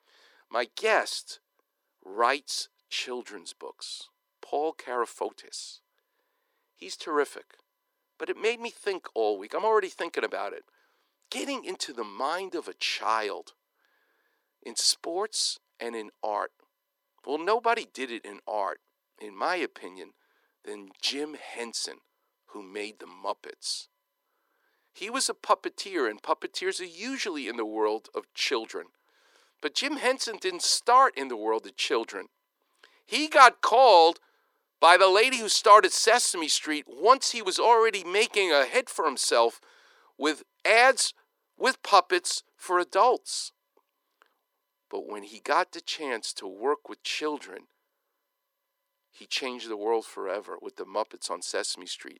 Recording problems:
thin; very; fading below 400 Hz

